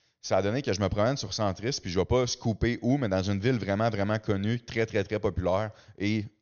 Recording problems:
high frequencies cut off; noticeable; nothing above 6.5 kHz

